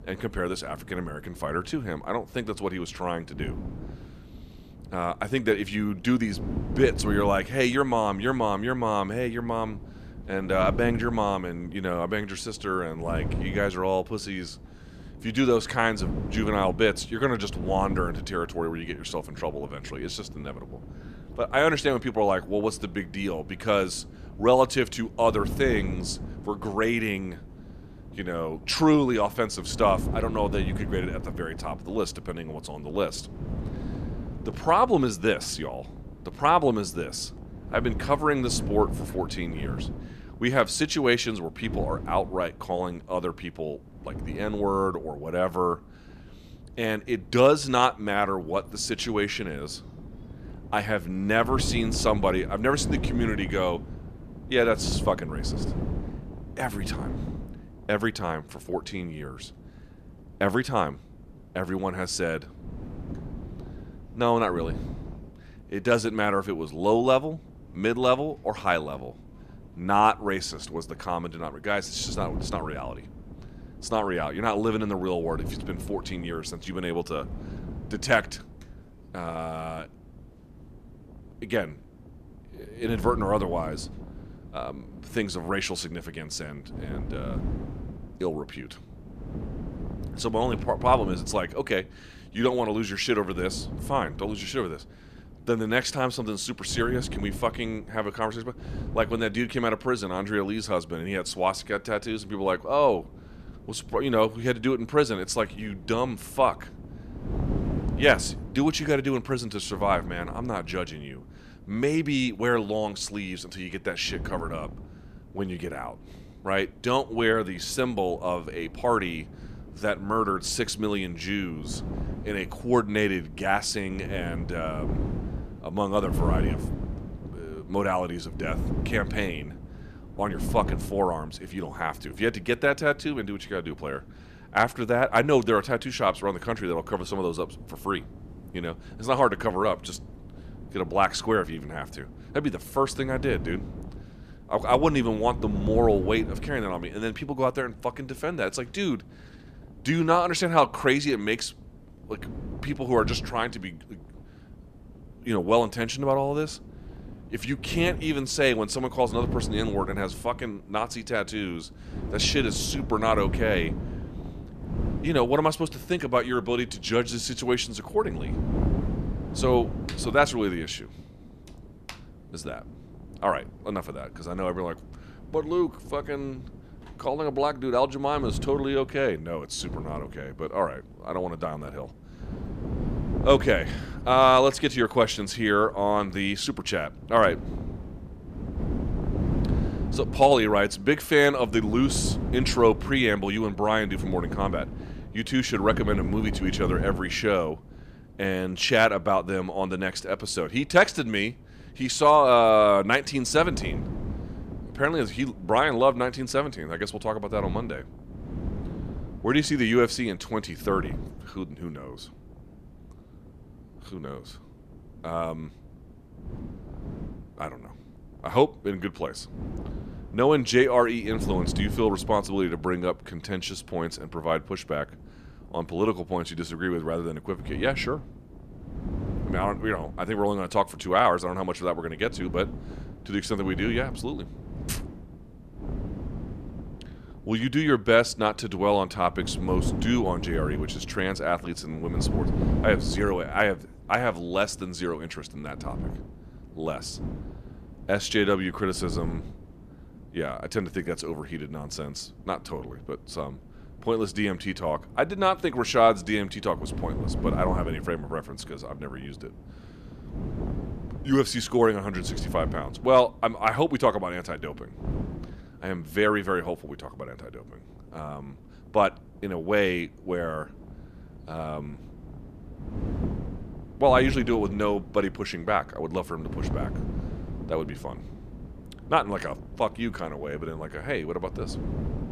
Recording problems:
wind noise on the microphone; occasional gusts; 20 dB below the speech

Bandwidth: 14.5 kHz